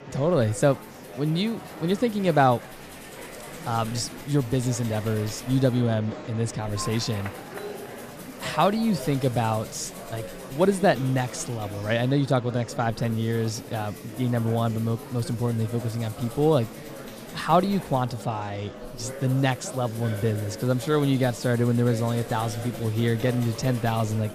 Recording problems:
murmuring crowd; noticeable; throughout; 15 dB below the speech
background music; faint; throughout; 20 dB below the speech

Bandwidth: 14.5 kHz